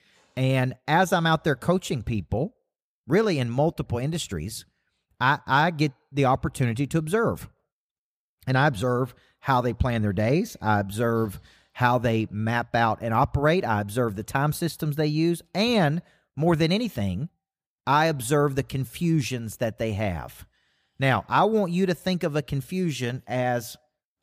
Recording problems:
none

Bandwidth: 15 kHz